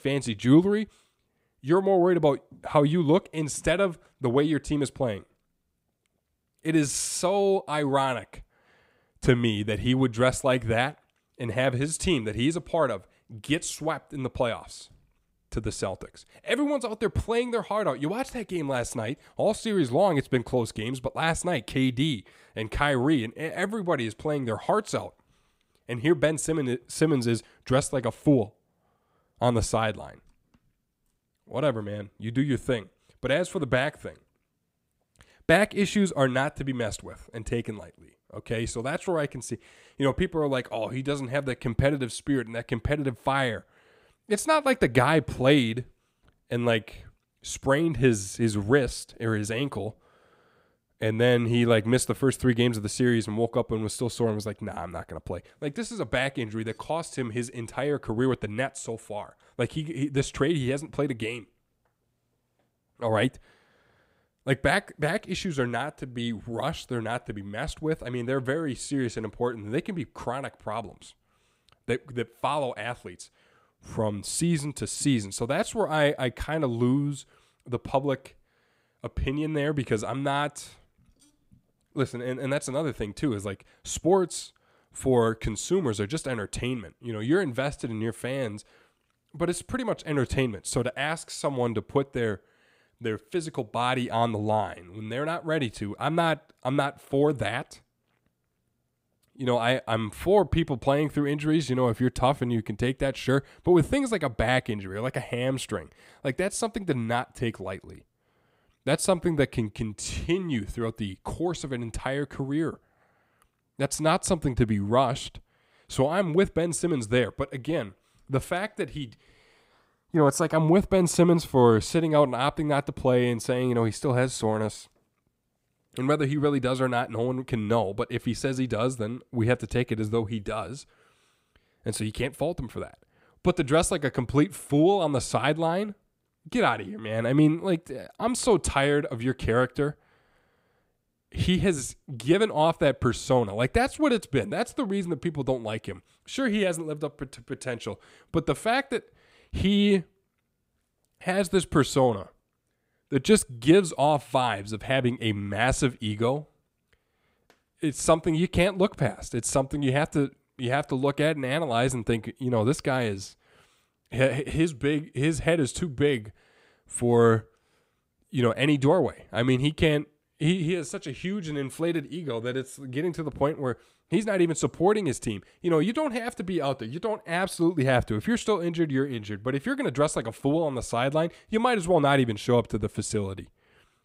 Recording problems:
none

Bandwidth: 15.5 kHz